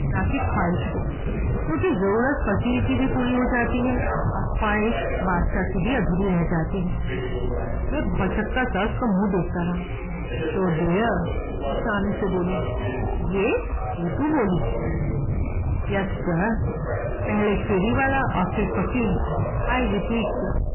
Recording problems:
distortion; heavy; 6 dB below the speech
garbled, watery; badly; nothing above 3 kHz
voice in the background; loud; throughout; 8 dB below the speech
low rumble; loud; throughout; 8 dB below the speech

